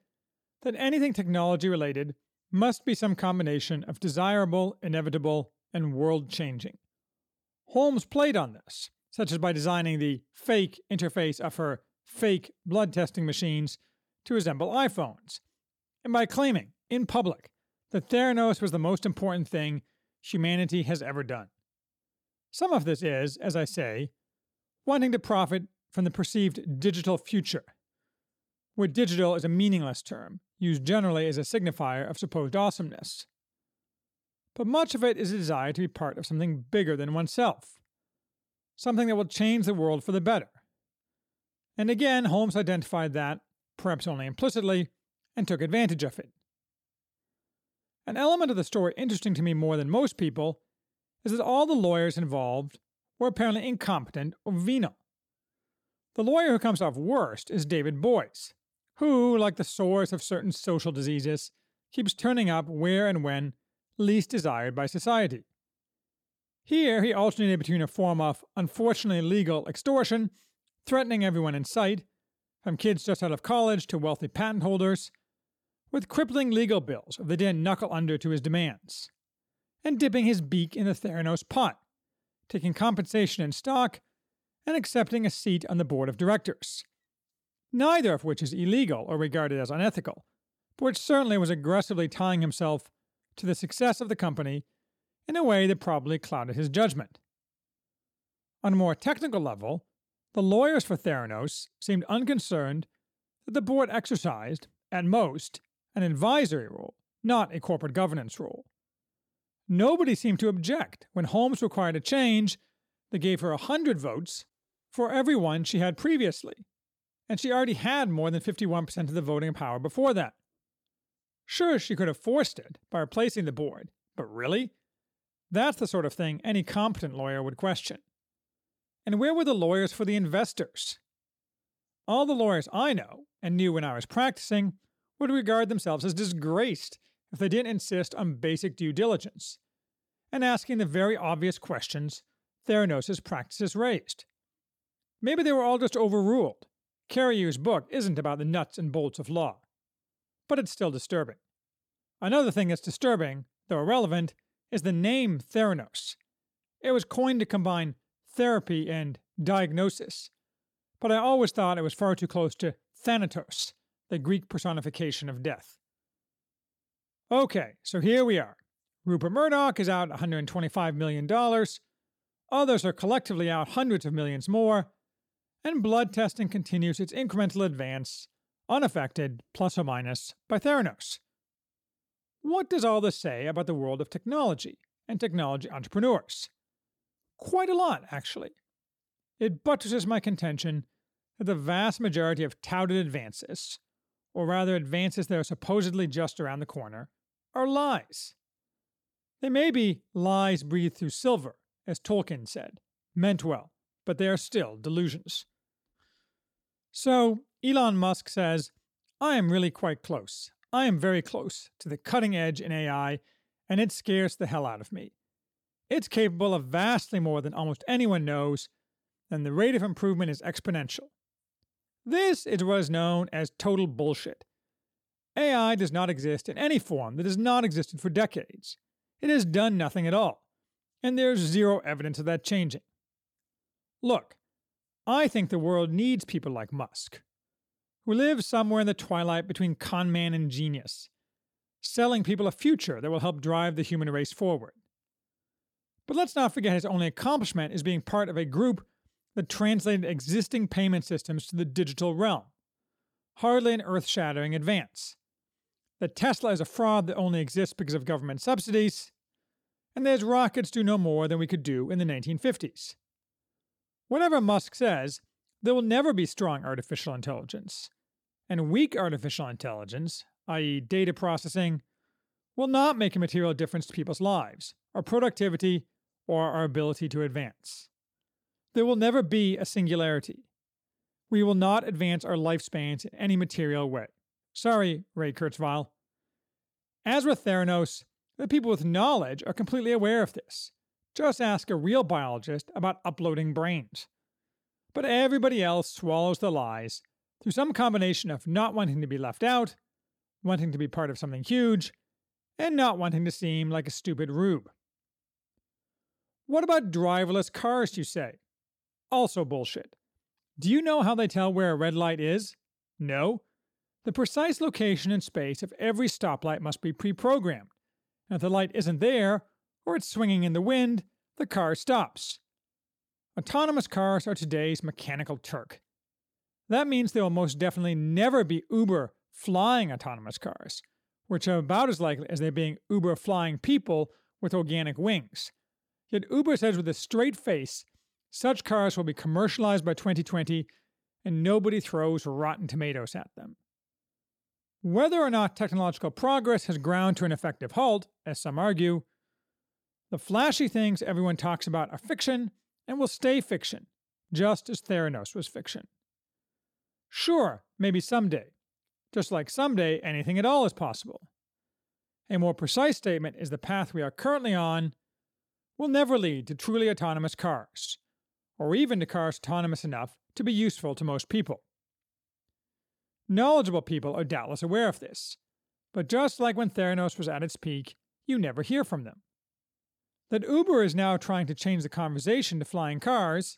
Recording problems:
none

